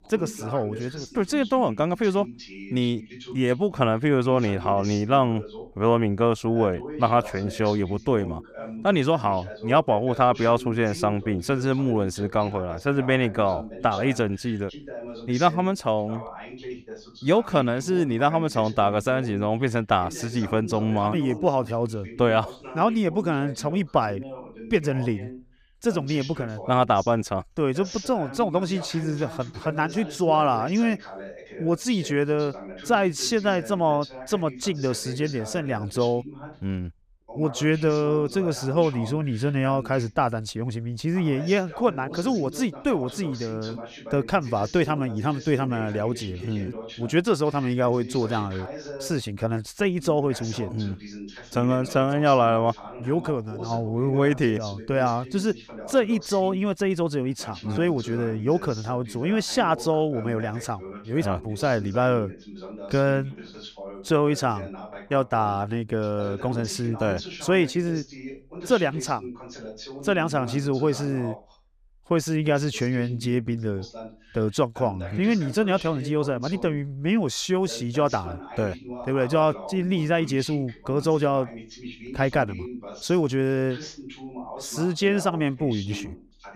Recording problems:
voice in the background; noticeable; throughout; 15 dB below the speech

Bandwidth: 15 kHz